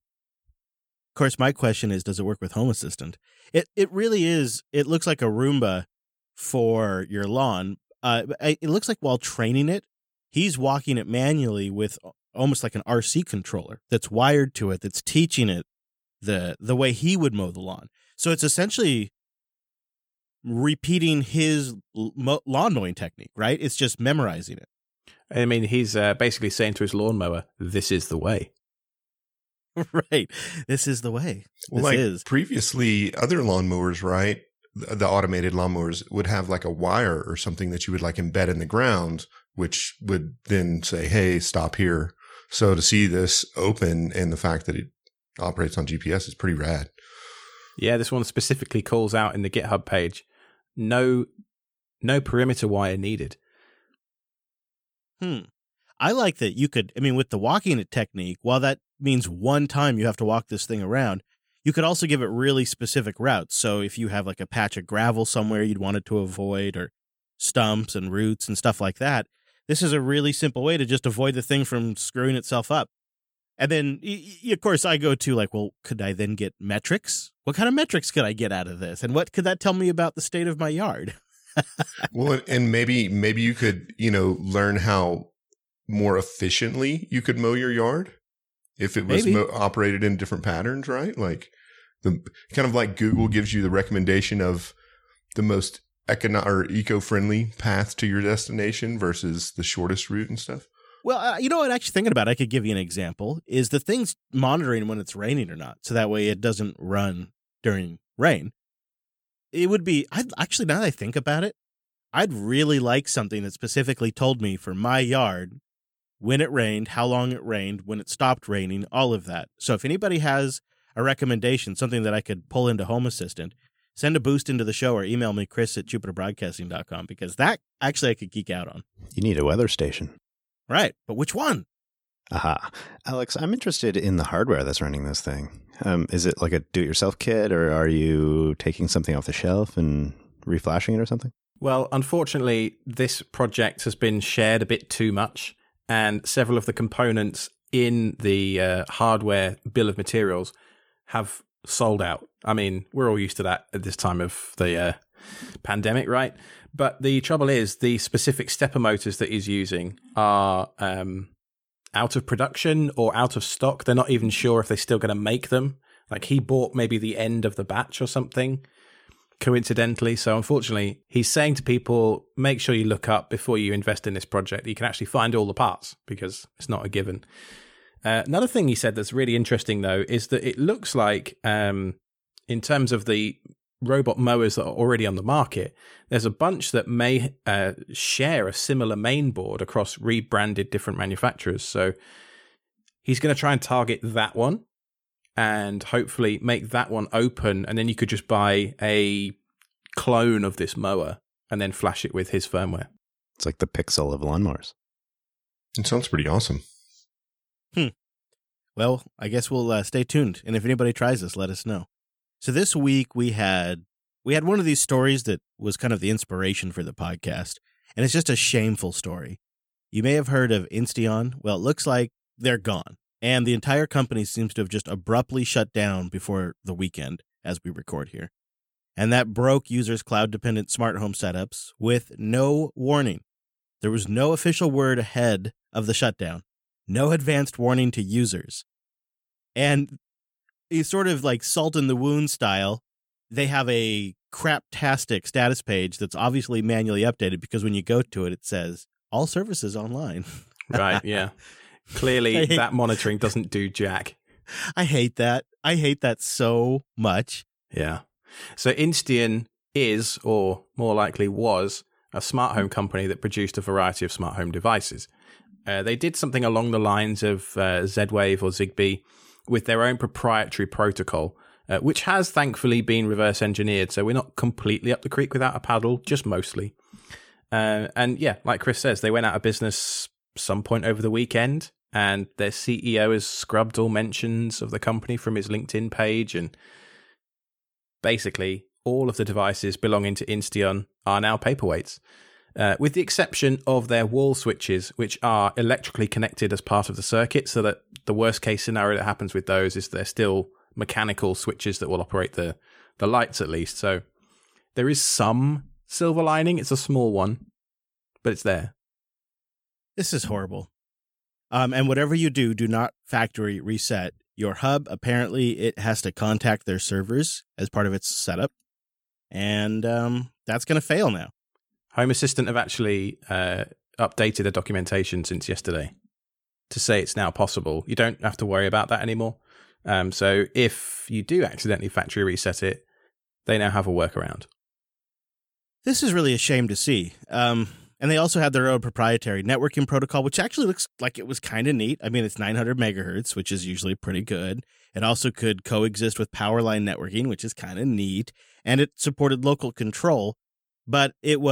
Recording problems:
abrupt cut into speech; at the end

